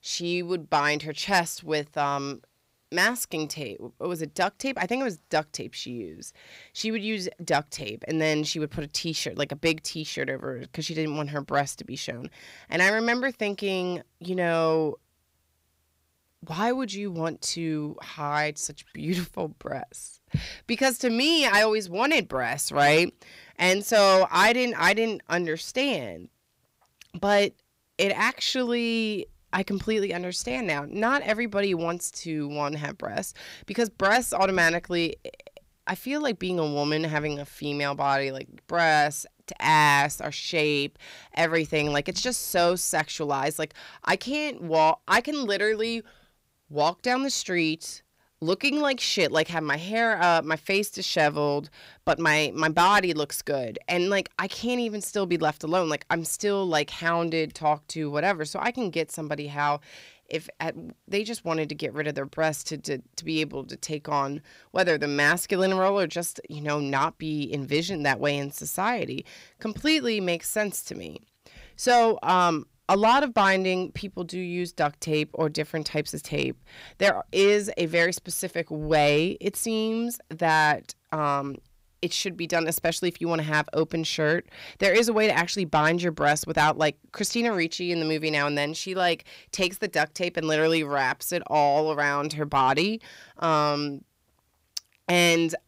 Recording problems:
distortion; slight; 10 dB below the speech

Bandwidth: 15.5 kHz